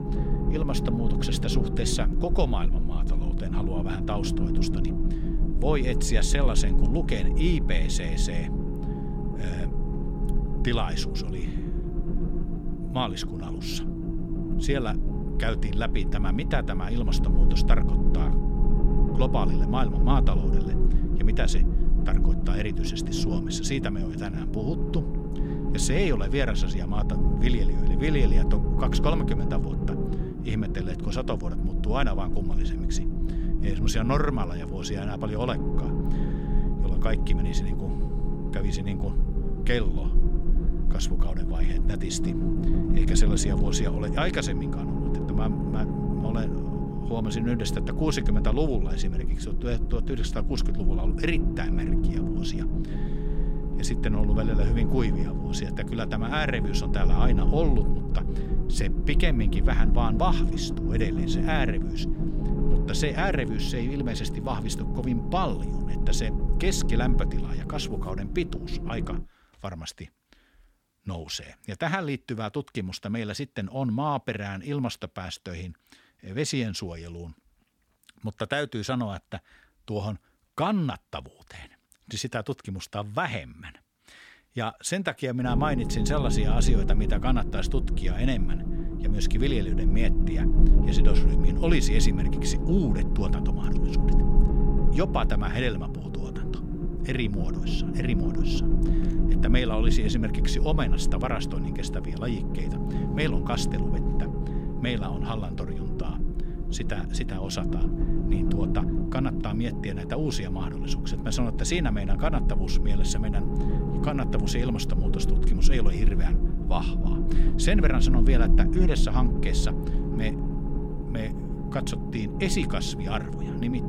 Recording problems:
low rumble; loud; until 1:09 and from 1:25 on; 5 dB below the speech

